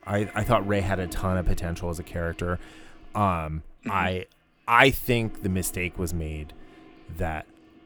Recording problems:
household noises; noticeable; throughout; 20 dB below the speech

